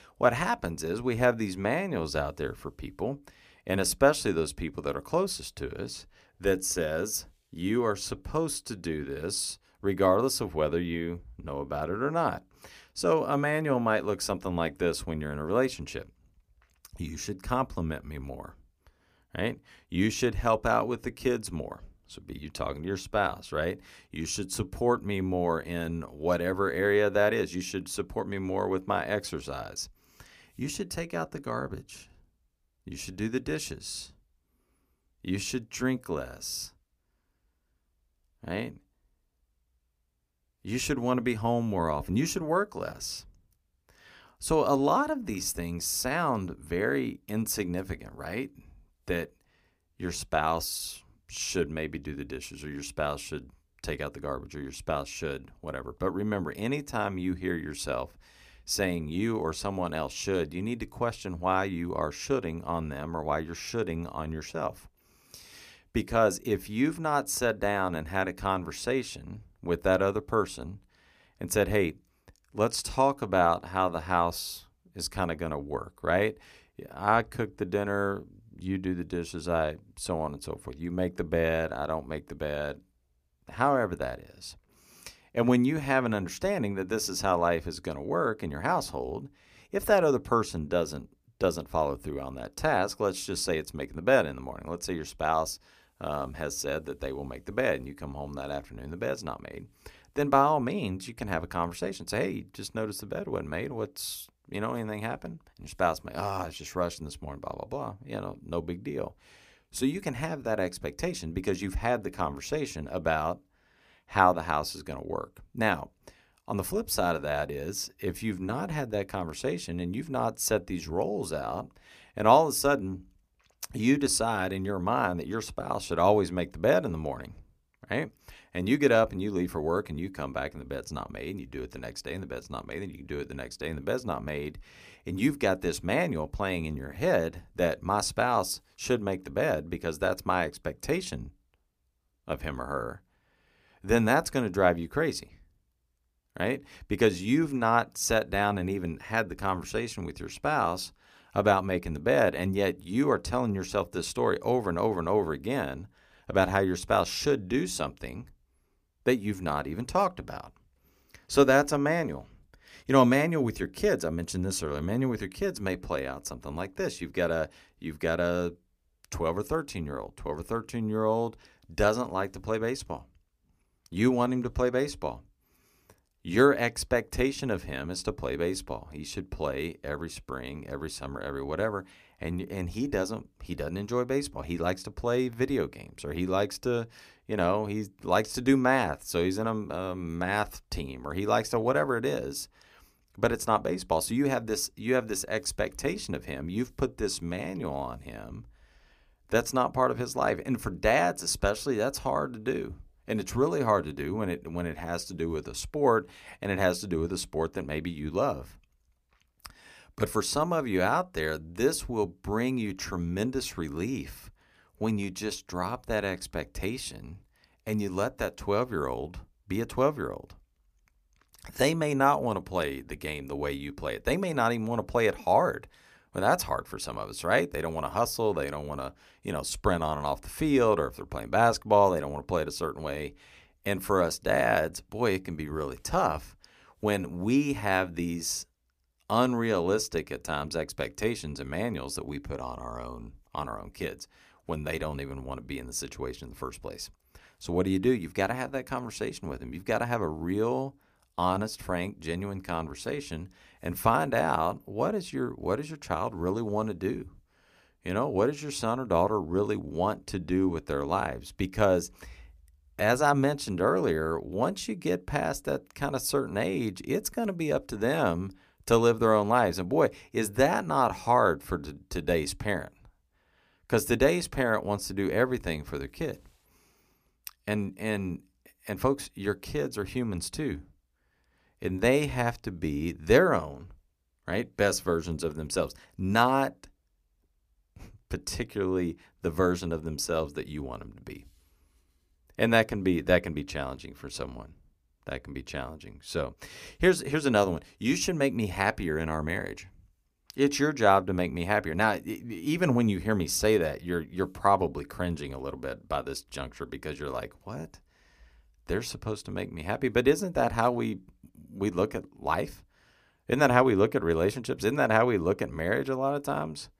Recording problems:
none

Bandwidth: 15 kHz